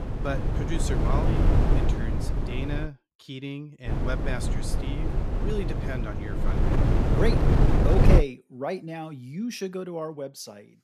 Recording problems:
wind noise on the microphone; heavy; until 3 s and from 4 to 8 s; 2 dB above the speech

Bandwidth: 14.5 kHz